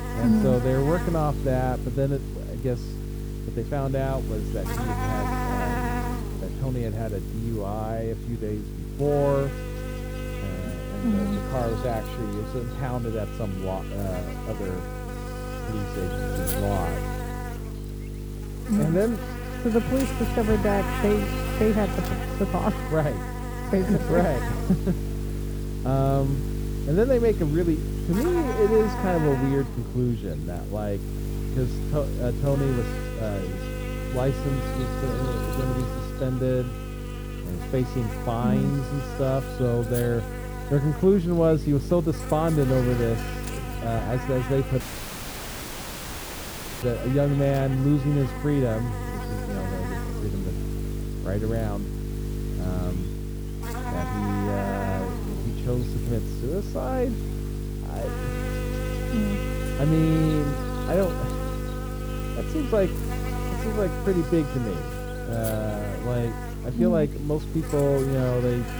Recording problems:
muffled; very; fading above 1.5 kHz
electrical hum; loud; throughout; 50 Hz, 6 dB below the speech
audio cutting out; at 45 s for 2 s

